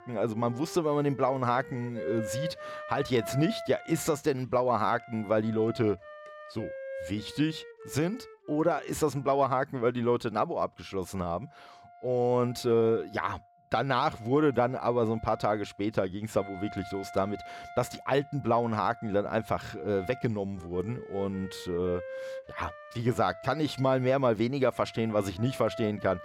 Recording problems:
background music; noticeable; throughout; 15 dB below the speech

